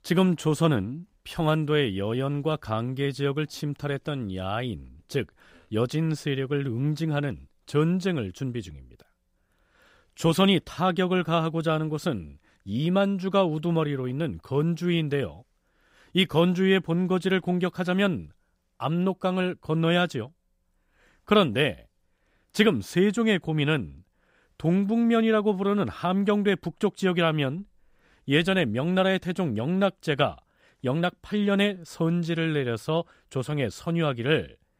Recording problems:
none

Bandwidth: 15.5 kHz